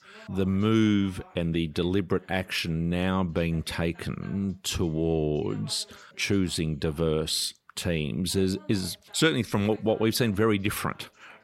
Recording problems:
voice in the background; faint; throughout; 30 dB below the speech

